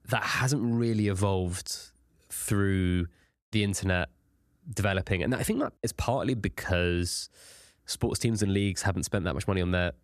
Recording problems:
none

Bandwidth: 14.5 kHz